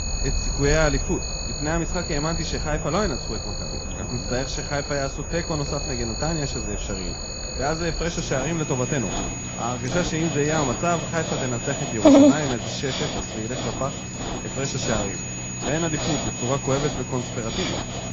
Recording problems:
garbled, watery; badly
animal sounds; very loud; throughout; as loud as the speech
high-pitched whine; loud; throughout; 6.5 kHz, 6 dB below the speech
murmuring crowd; faint; throughout; 20 dB below the speech

